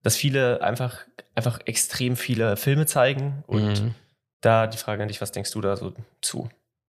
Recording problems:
none

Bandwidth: 15 kHz